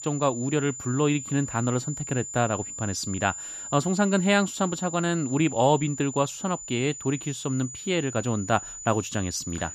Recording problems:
high-pitched whine; loud; throughout; 7 kHz, 9 dB below the speech

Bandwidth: 14.5 kHz